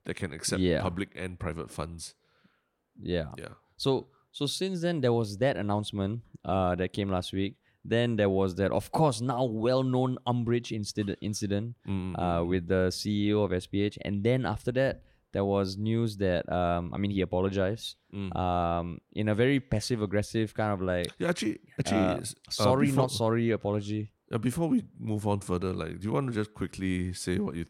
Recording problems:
none

